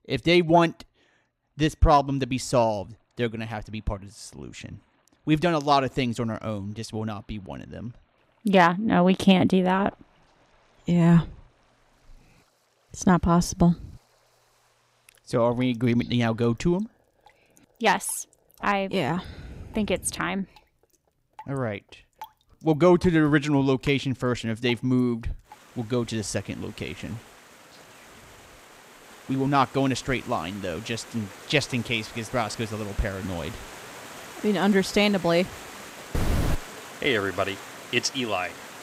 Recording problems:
rain or running water; noticeable; throughout; 20 dB below the speech

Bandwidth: 15.5 kHz